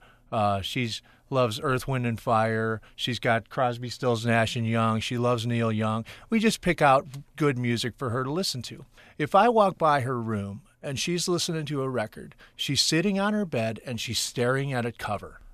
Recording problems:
none

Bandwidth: 14 kHz